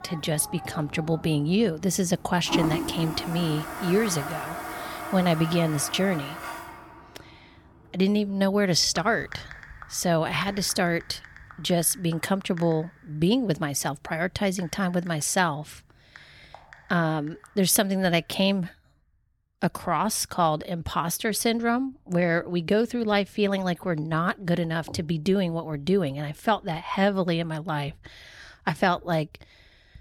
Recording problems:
household noises; noticeable; throughout; 10 dB below the speech

